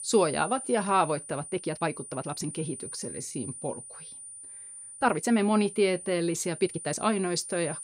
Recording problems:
high-pitched whine; noticeable; throughout; 9.5 kHz, 10 dB below the speech
uneven, jittery; strongly; from 0.5 to 7 s

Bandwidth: 15.5 kHz